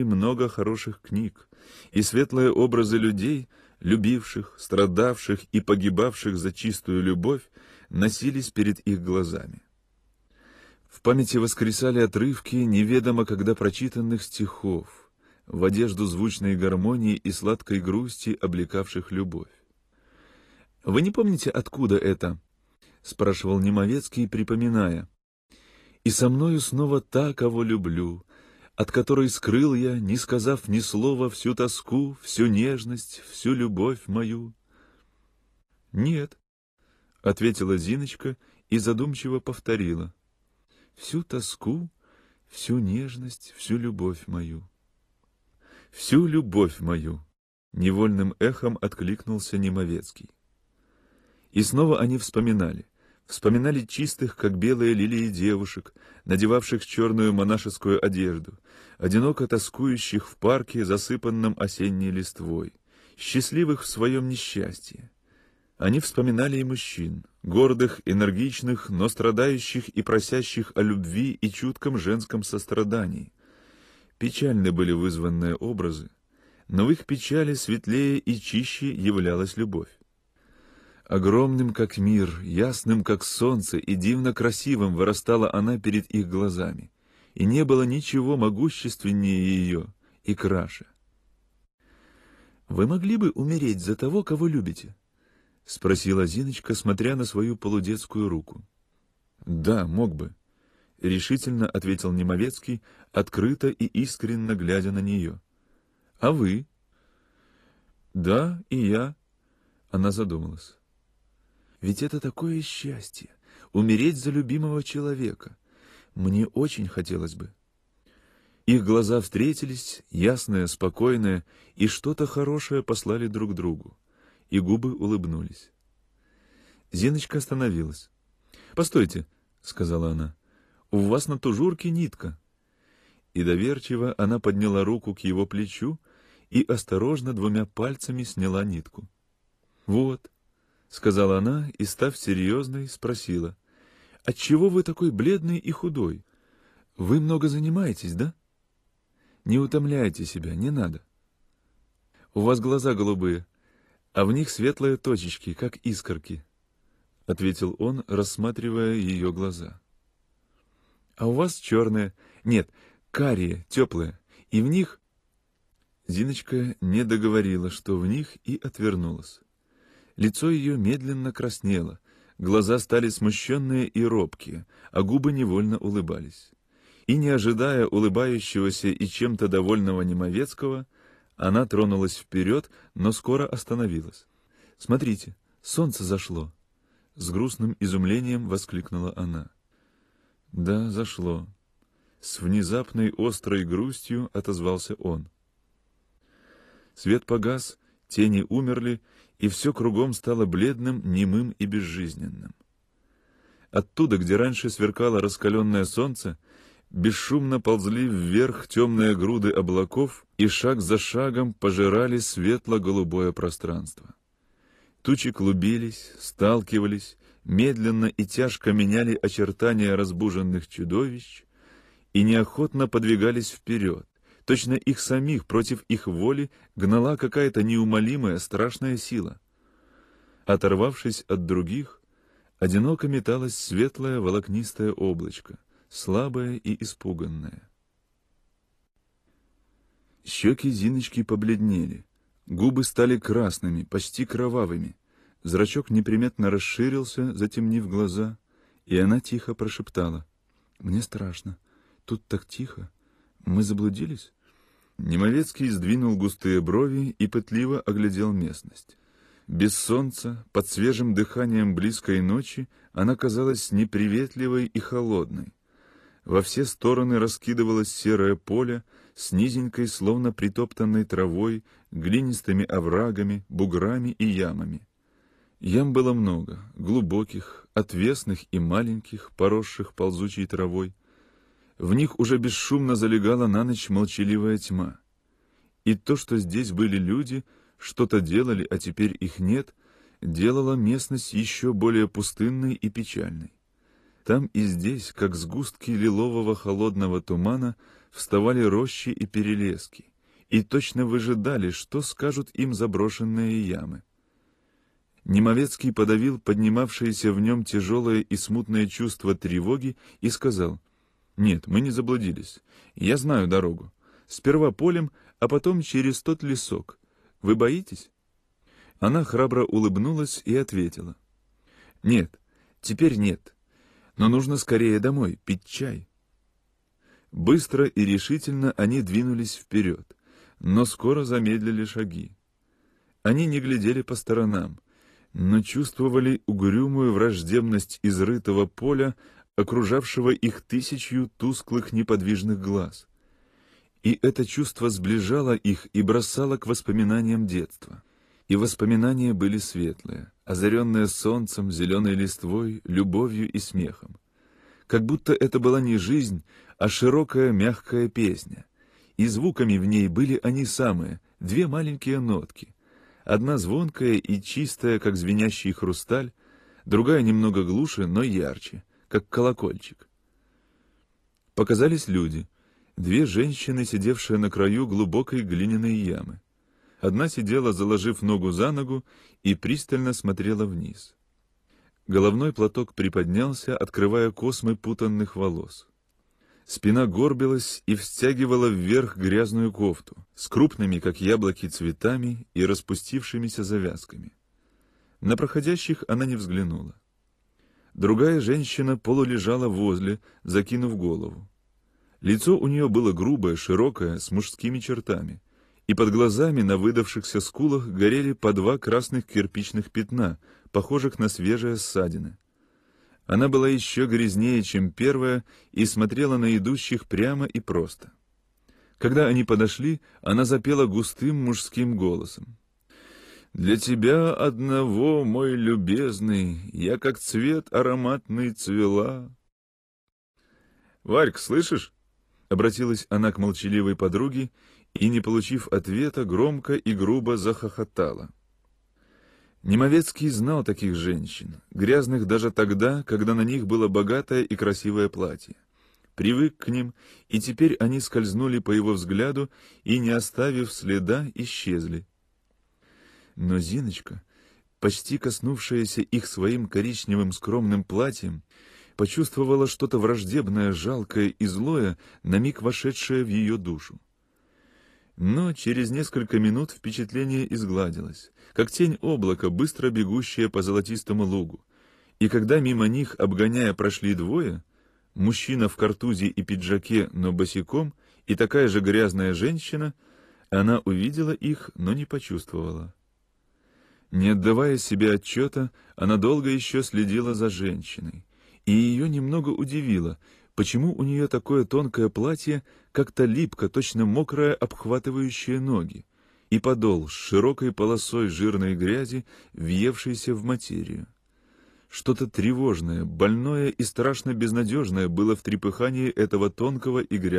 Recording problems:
garbled, watery; slightly; nothing above 14.5 kHz
abrupt cut into speech; at the start and the end

